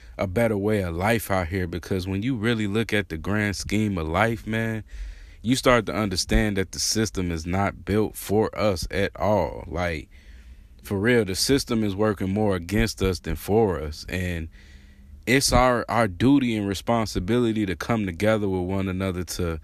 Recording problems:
none

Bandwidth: 14.5 kHz